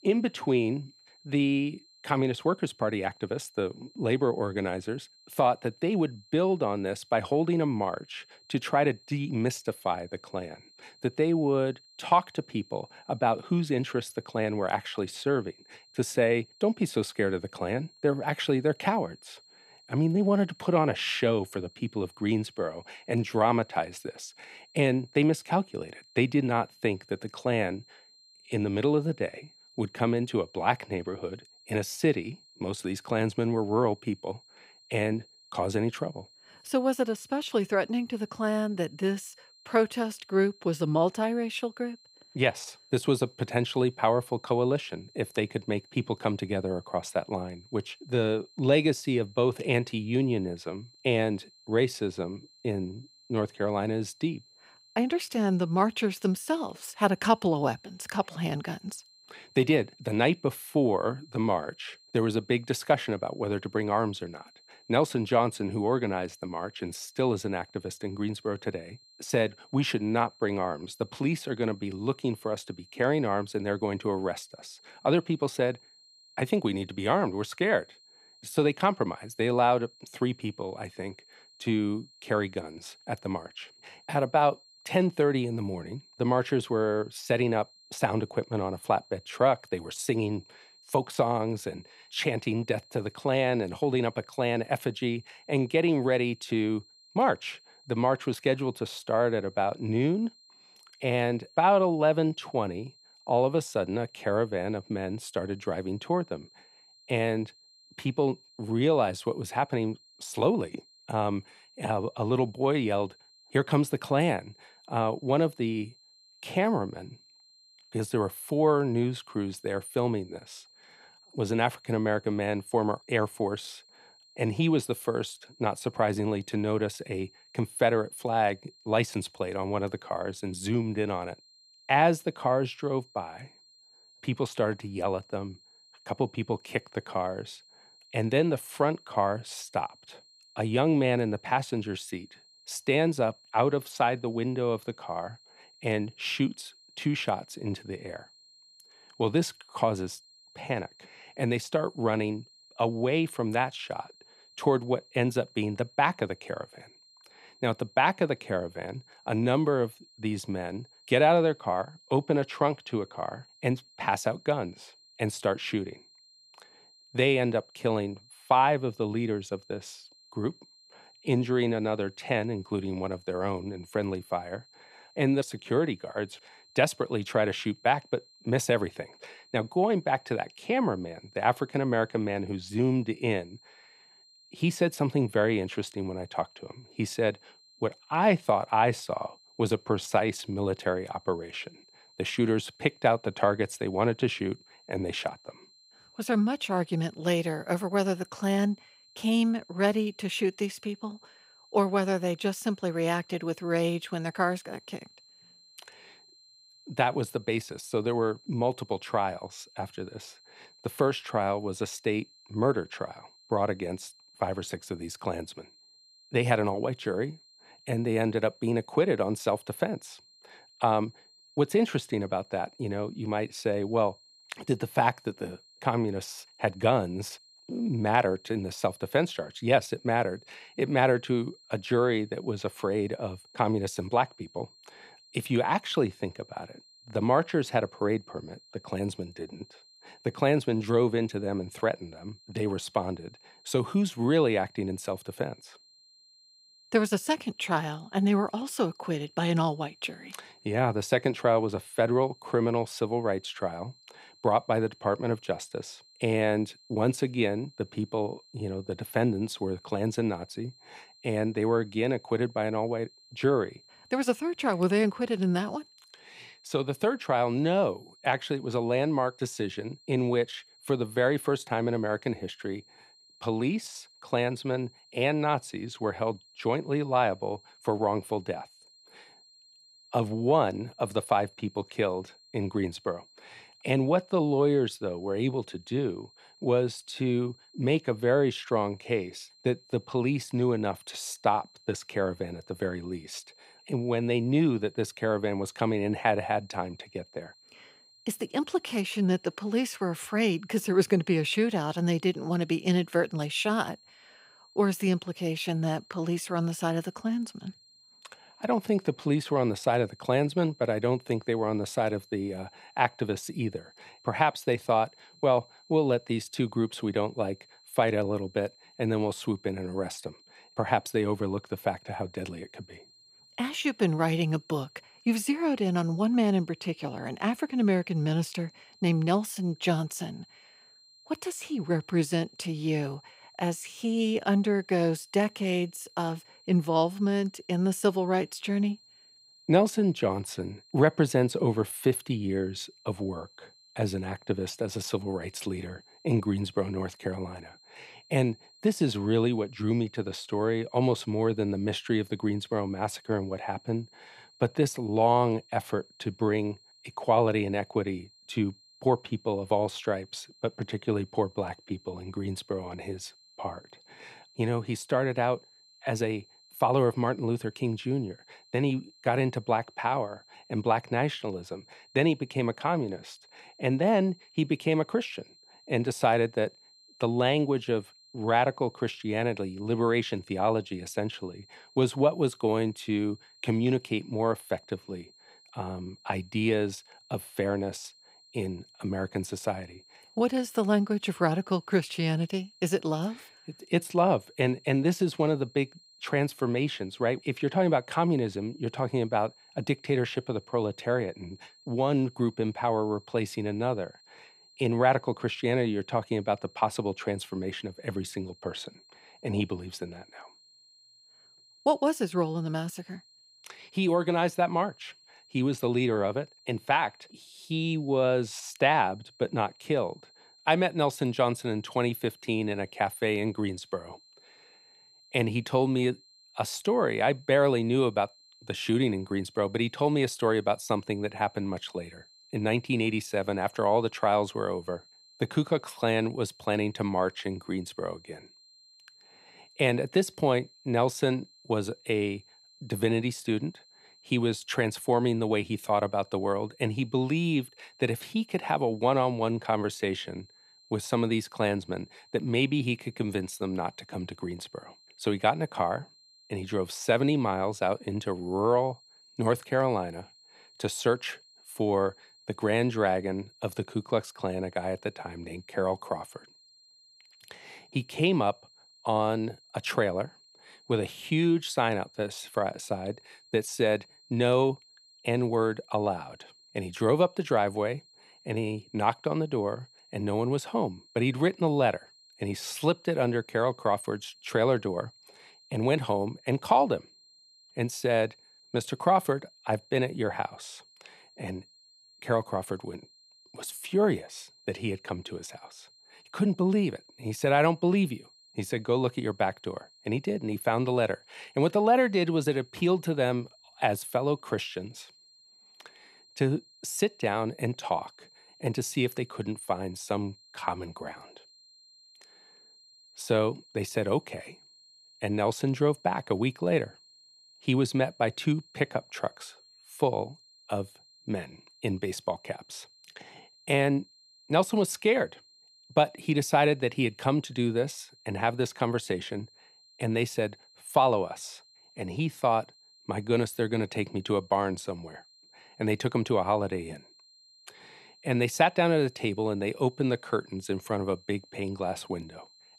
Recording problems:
high-pitched whine; faint; throughout; 4 kHz, 25 dB below the speech

